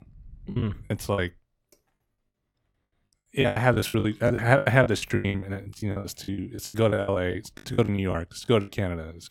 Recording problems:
choppy; very; 22% of the speech affected

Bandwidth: 17 kHz